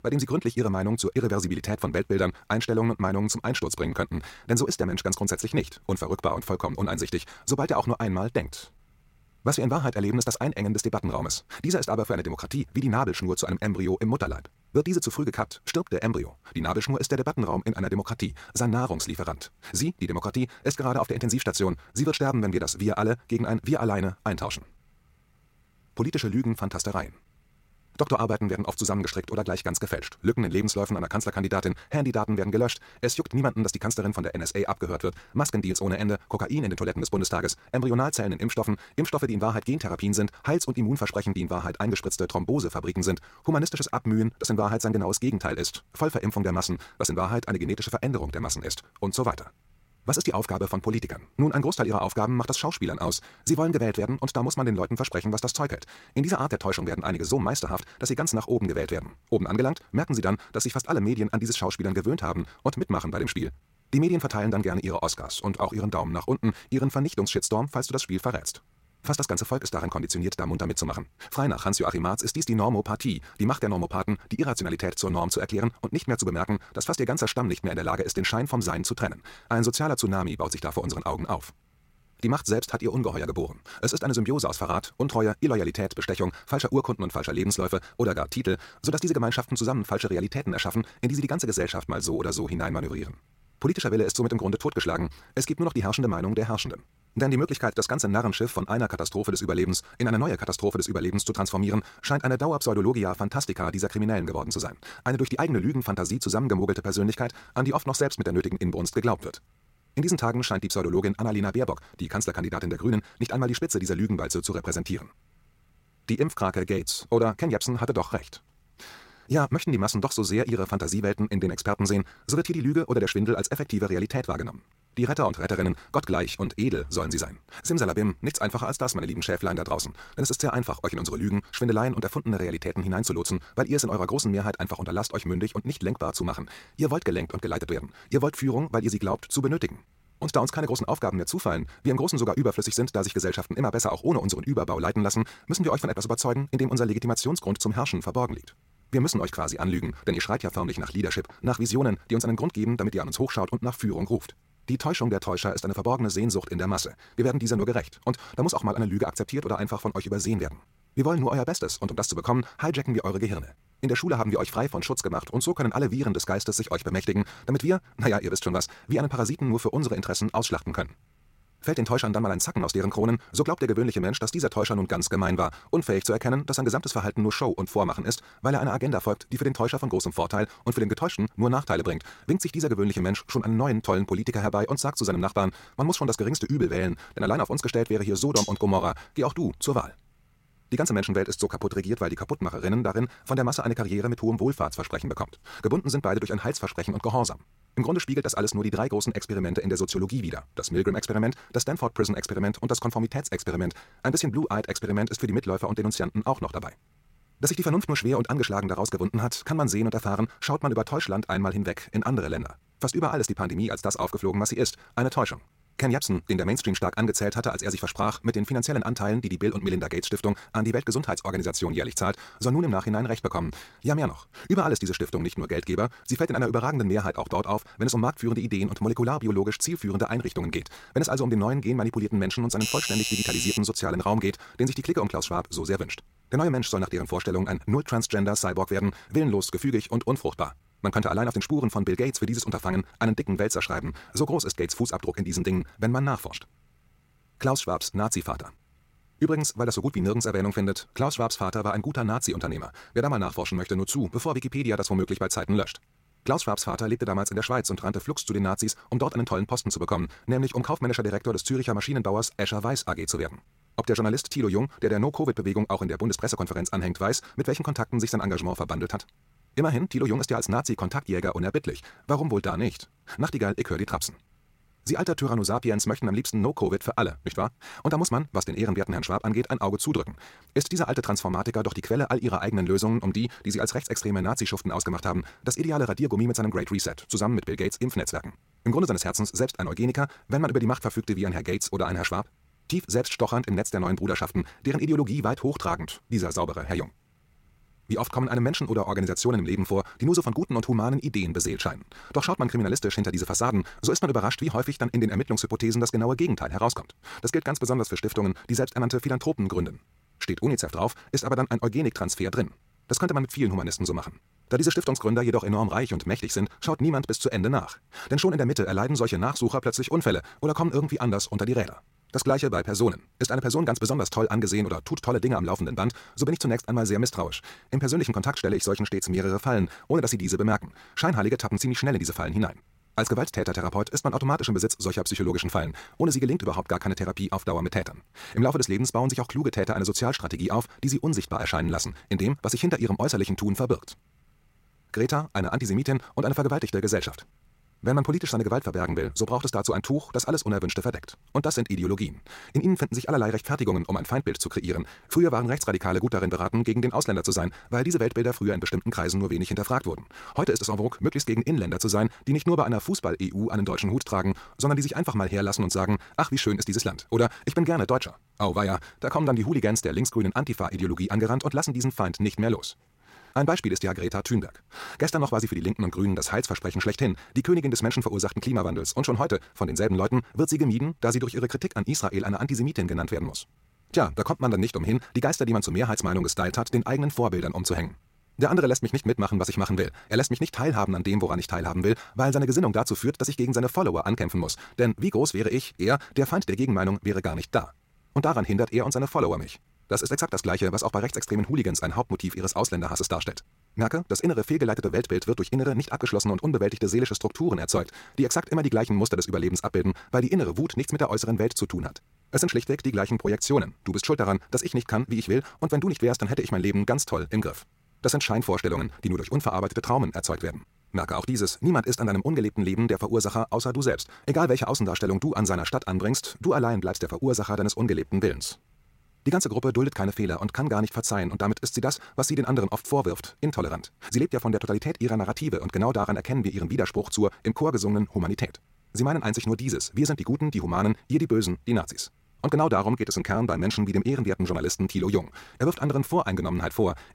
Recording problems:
wrong speed, natural pitch; too fast; 1.6 times normal speed
clattering dishes; noticeable; at 3:08; peak 1 dB below the speech
doorbell; loud; from 3:53 to 3:54; peak level with the speech

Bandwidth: 16 kHz